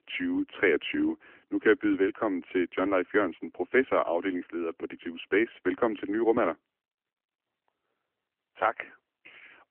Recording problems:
phone-call audio; nothing above 3 kHz

